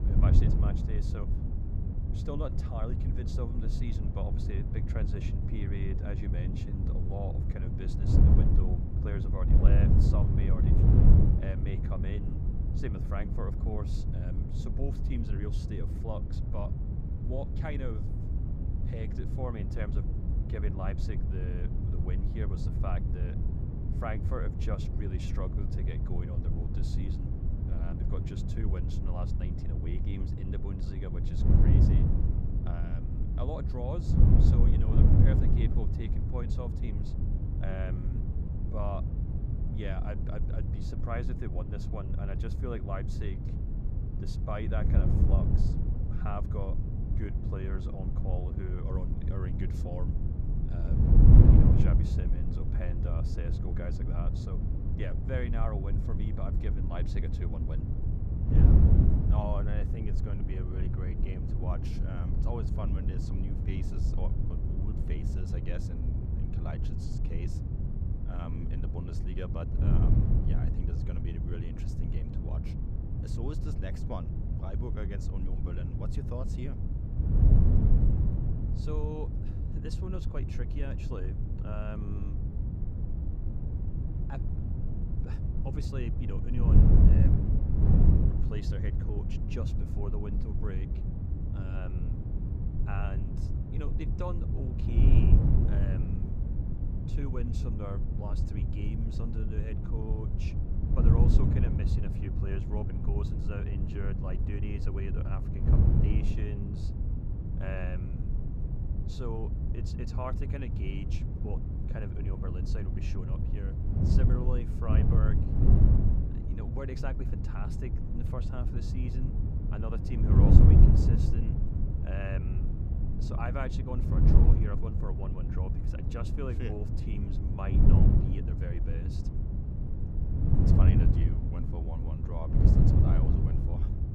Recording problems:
wind noise on the microphone; heavy; 2 dB above the speech

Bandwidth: 15.5 kHz